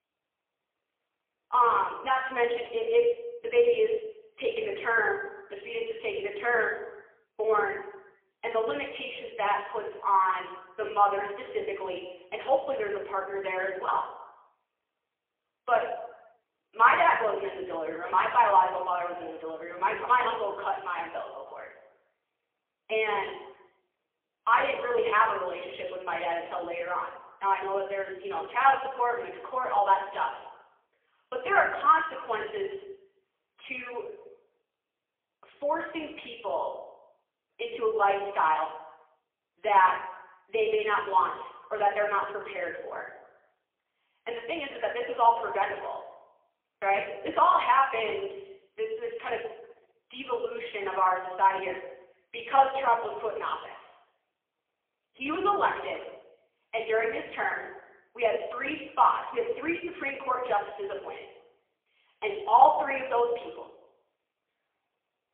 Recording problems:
phone-call audio; poor line; nothing above 3.5 kHz
room echo; noticeable; dies away in 0.8 s
off-mic speech; somewhat distant

